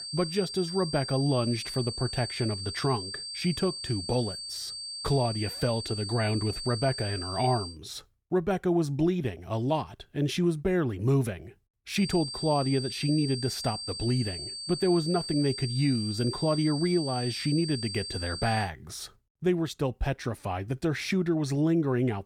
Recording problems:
high-pitched whine; loud; until 7.5 s and from 12 to 19 s; 4.5 kHz, 6 dB below the speech

